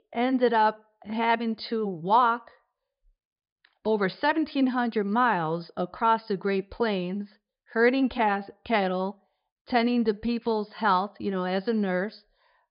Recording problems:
high frequencies cut off; noticeable; nothing above 5 kHz

